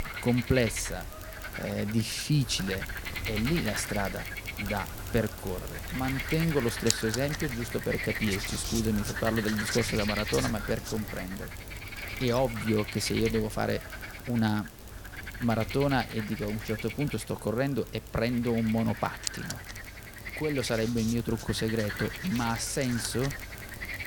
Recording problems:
animal sounds; loud; throughout; 6 dB below the speech

